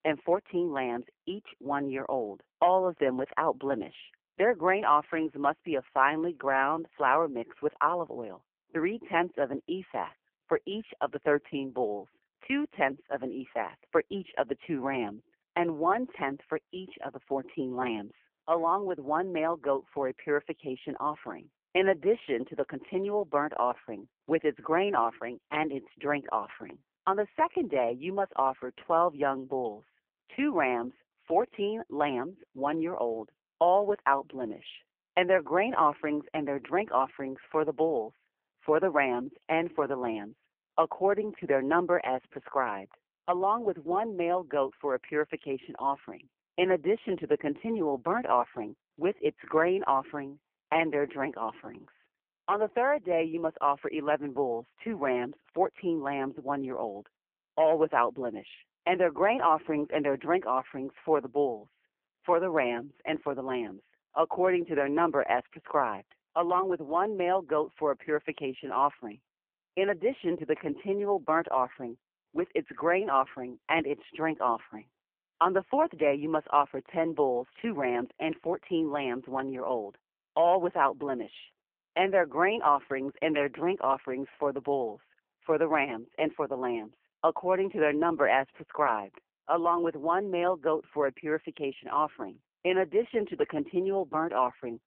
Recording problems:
phone-call audio; poor line

